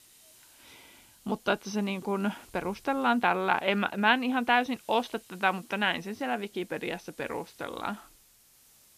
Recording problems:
high frequencies cut off; noticeable; nothing above 6.5 kHz
hiss; faint; throughout; 25 dB below the speech

